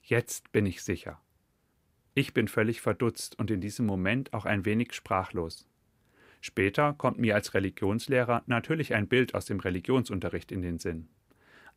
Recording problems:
none

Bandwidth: 15.5 kHz